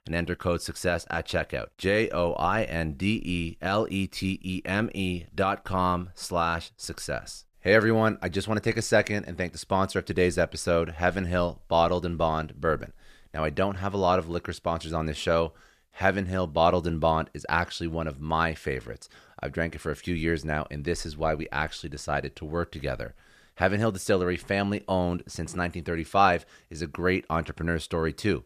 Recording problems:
none

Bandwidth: 14.5 kHz